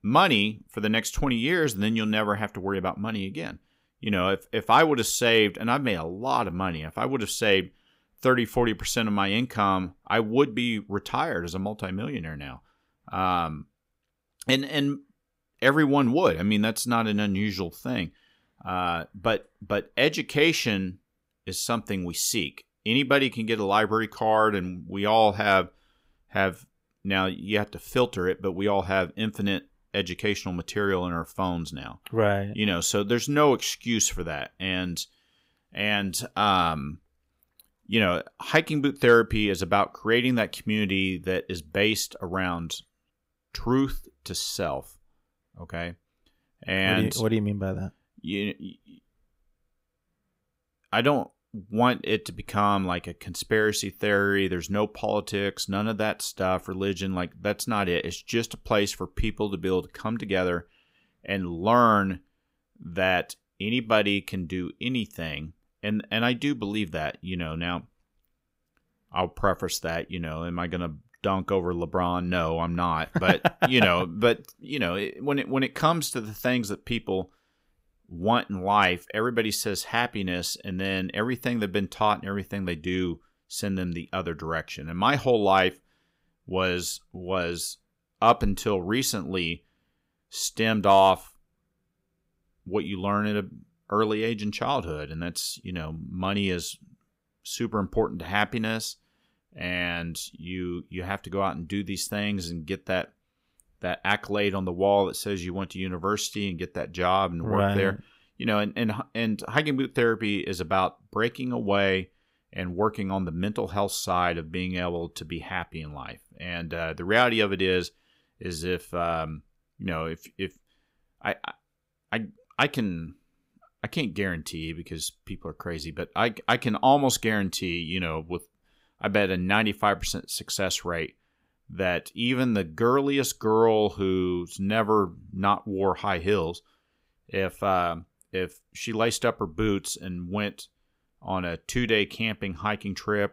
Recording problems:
none

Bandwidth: 15.5 kHz